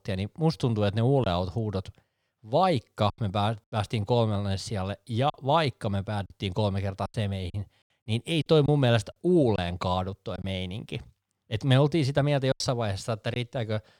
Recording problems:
choppy; occasionally; 5% of the speech affected

